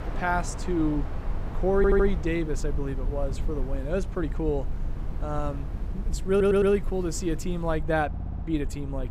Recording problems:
train or aircraft noise; noticeable; throughout; 15 dB below the speech
low rumble; faint; throughout; 20 dB below the speech
audio stuttering; at 2 s, at 6.5 s and at 8 s

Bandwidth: 15.5 kHz